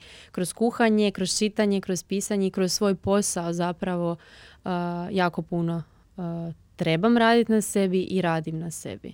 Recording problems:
none

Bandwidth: 16.5 kHz